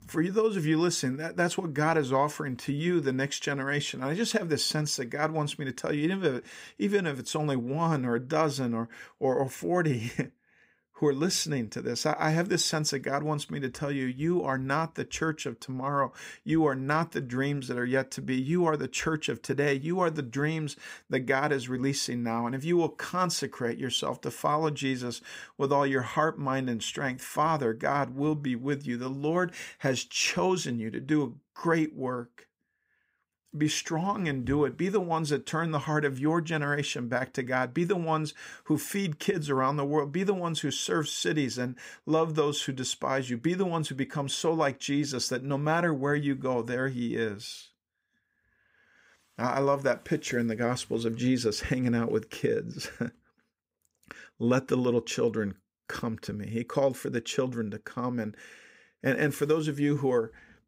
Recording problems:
none

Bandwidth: 15.5 kHz